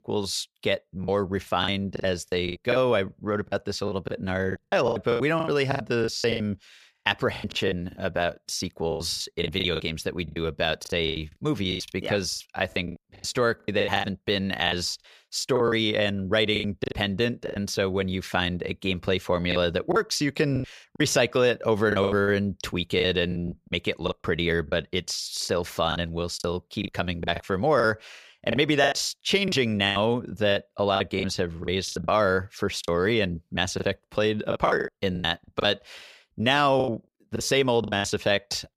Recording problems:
choppy; very; 14% of the speech affected

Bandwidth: 15 kHz